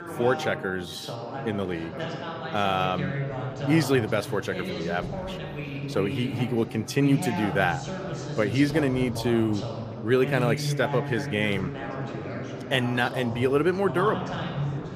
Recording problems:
background chatter; loud; throughout; 4 voices, 6 dB below the speech

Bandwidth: 15 kHz